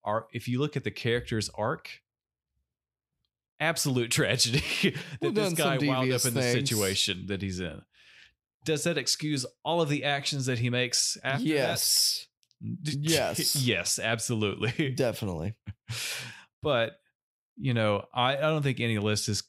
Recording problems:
none

